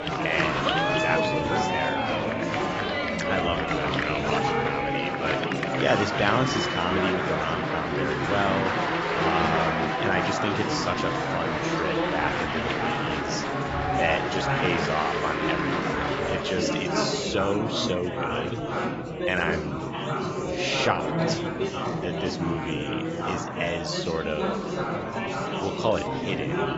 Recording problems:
garbled, watery; badly; nothing above 7.5 kHz
chatter from many people; very loud; throughout; 3 dB above the speech

